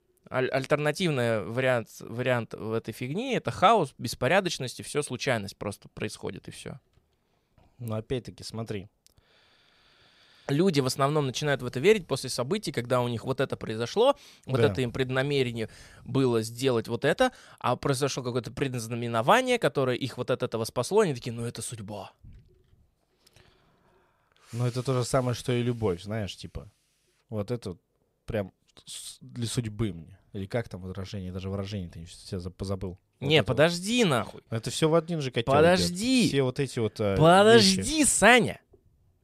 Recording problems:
none

